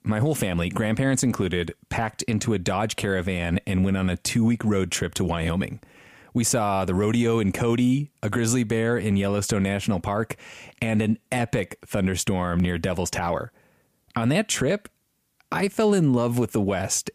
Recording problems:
squashed, flat; somewhat

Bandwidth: 15 kHz